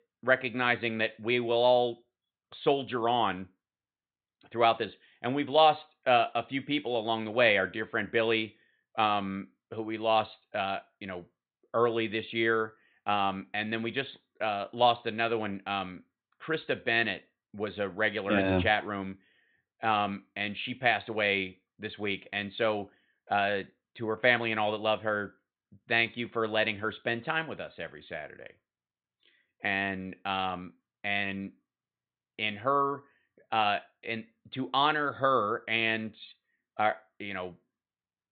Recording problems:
high frequencies cut off; severe; nothing above 4 kHz

